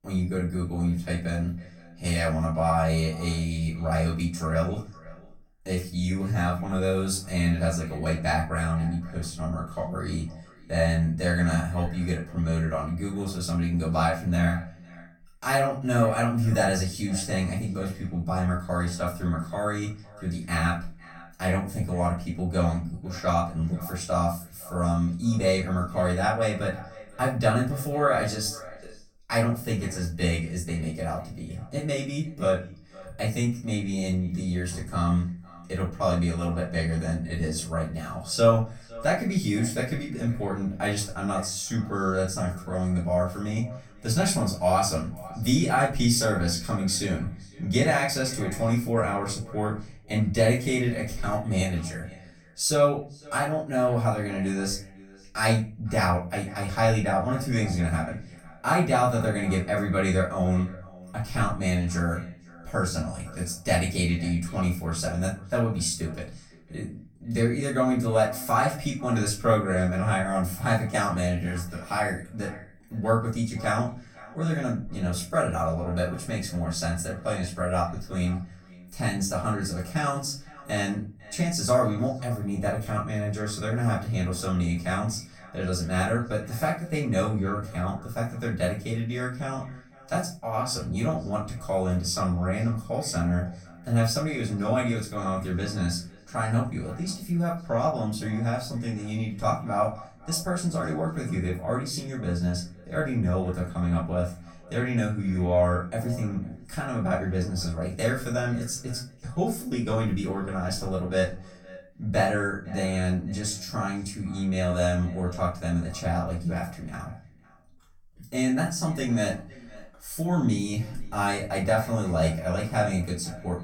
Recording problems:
off-mic speech; far
echo of what is said; faint; throughout; 500 ms later, 20 dB below the speech
room echo; slight; dies away in 0.3 s

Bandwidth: 17 kHz